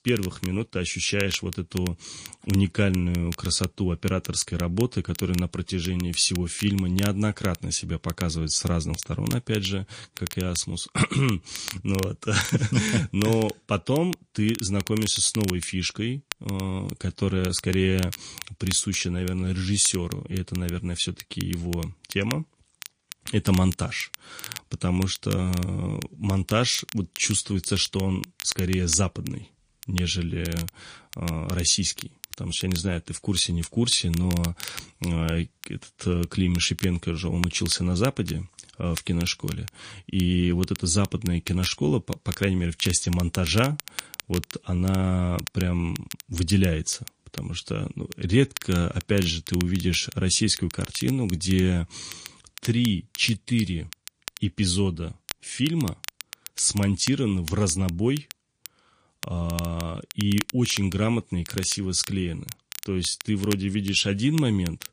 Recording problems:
garbled, watery; slightly
crackle, like an old record; noticeable; 15 dB below the speech

